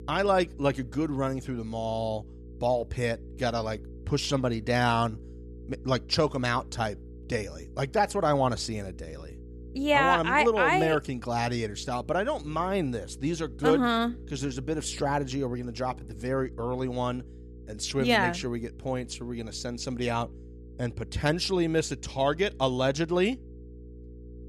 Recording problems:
electrical hum; faint; throughout; 60 Hz, 25 dB below the speech

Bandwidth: 14.5 kHz